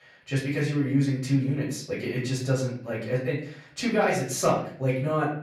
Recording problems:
off-mic speech; far
room echo; slight; dies away in 0.5 s

